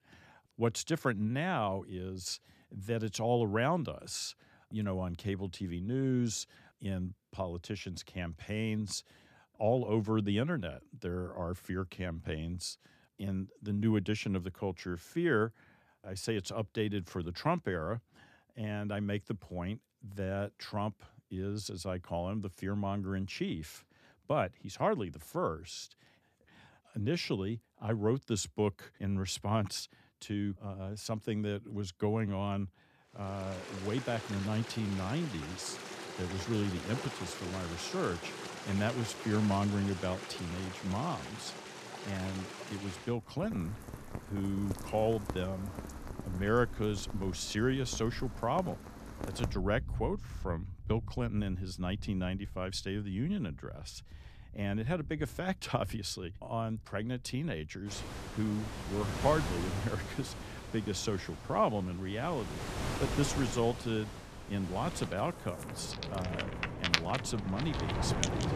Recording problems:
rain or running water; loud; from 33 s on; 6 dB below the speech

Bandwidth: 14.5 kHz